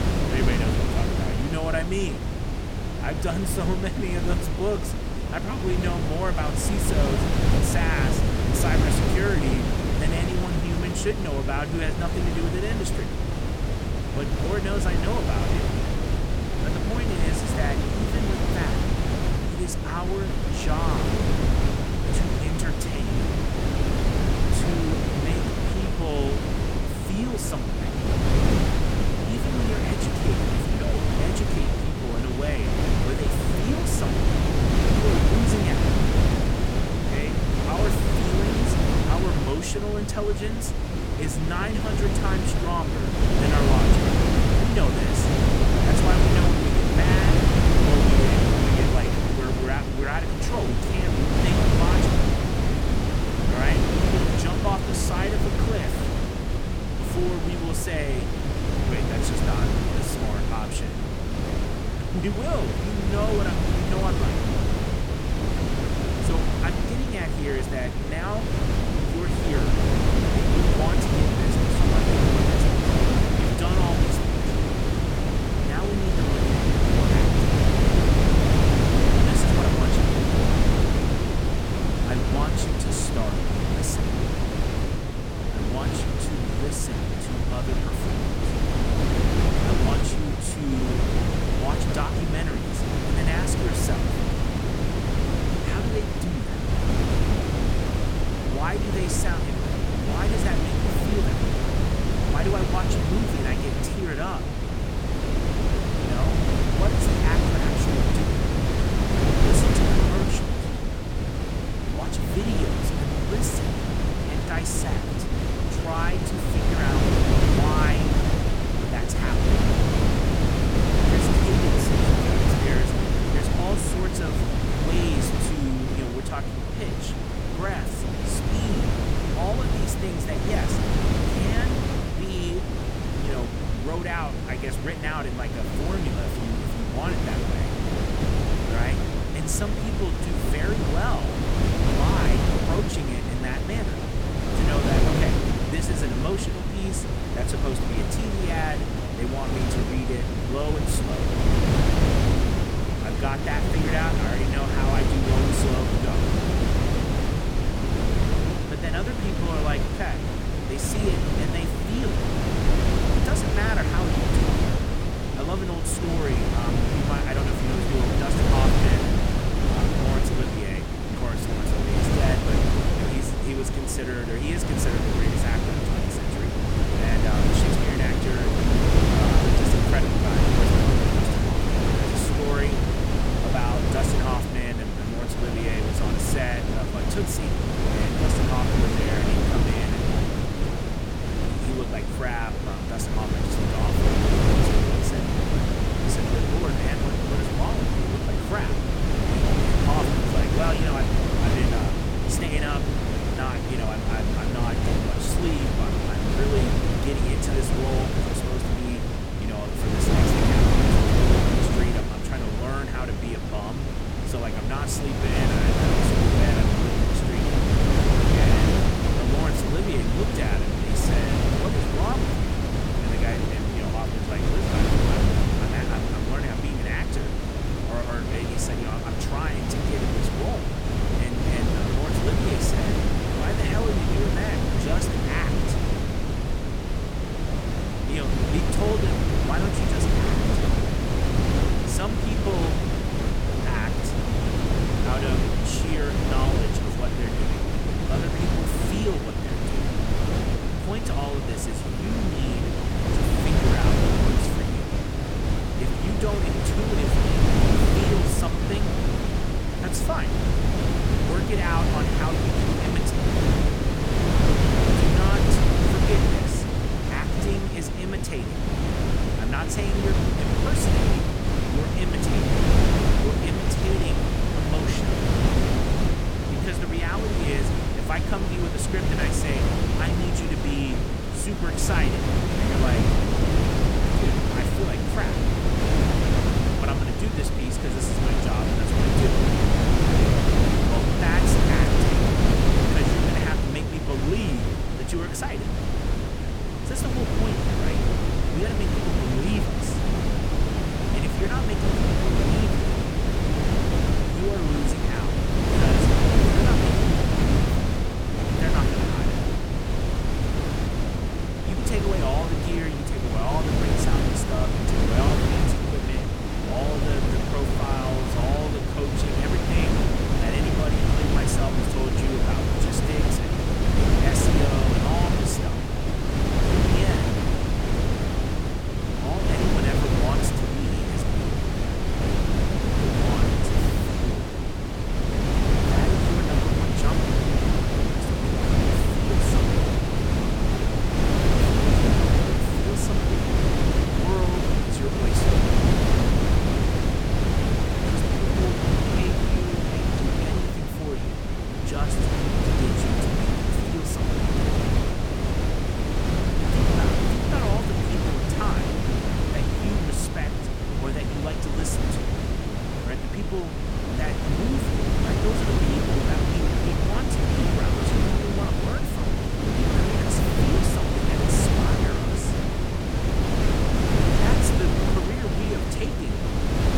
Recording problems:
wind noise on the microphone; heavy; 4 dB above the speech

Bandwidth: 18 kHz